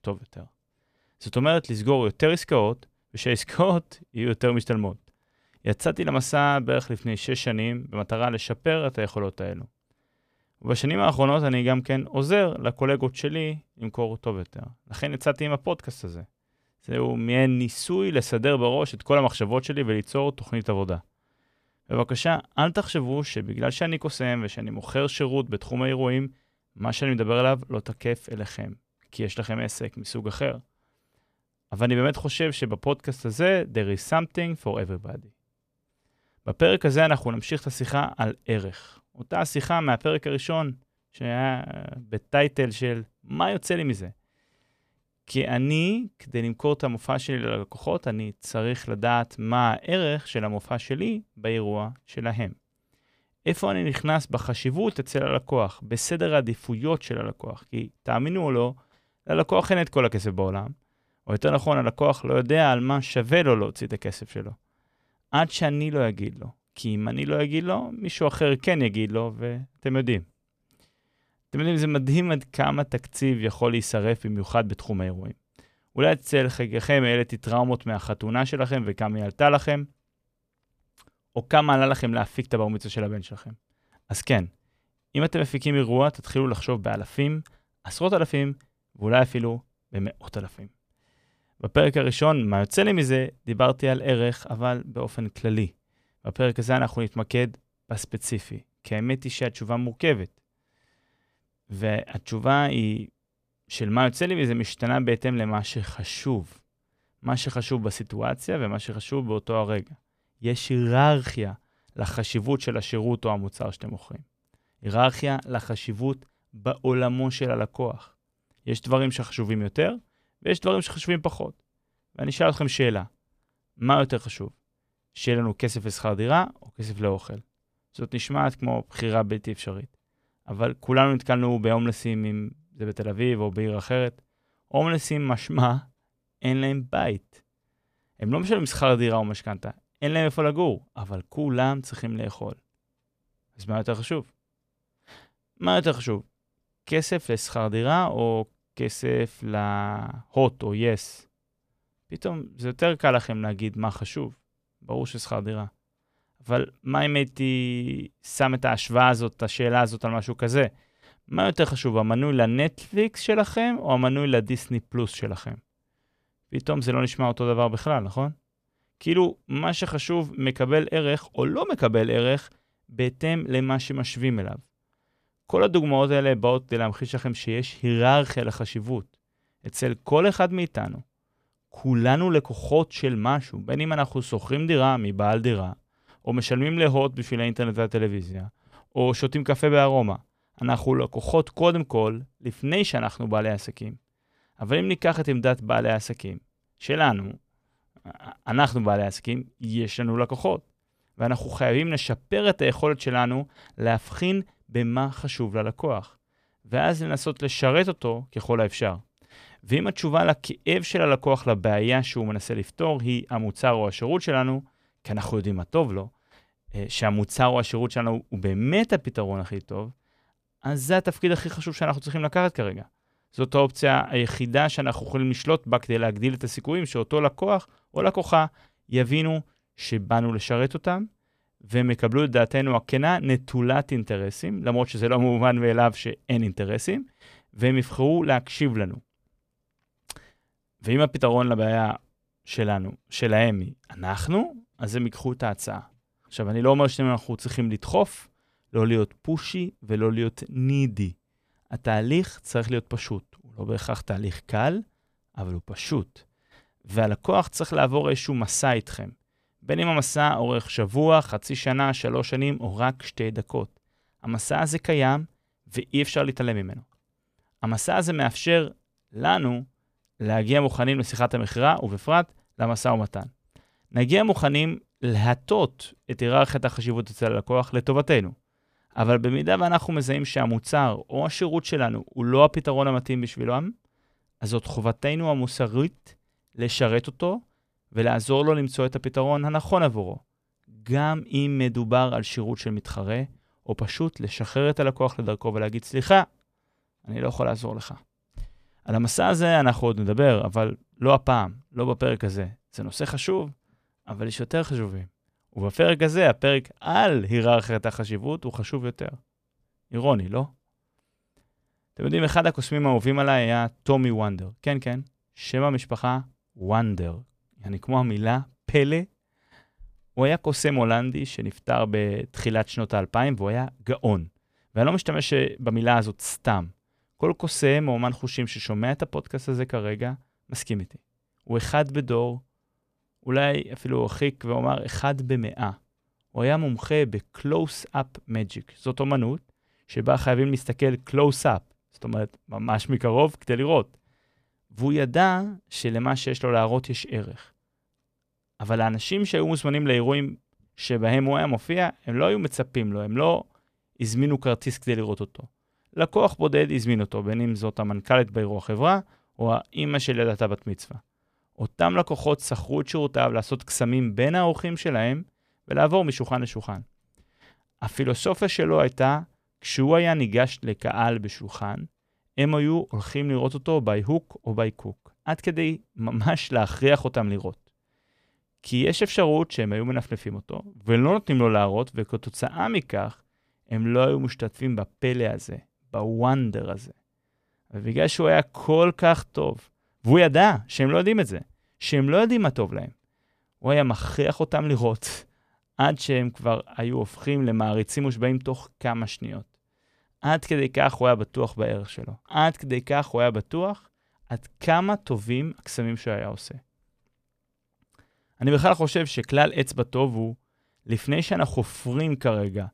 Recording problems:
none

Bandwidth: 15 kHz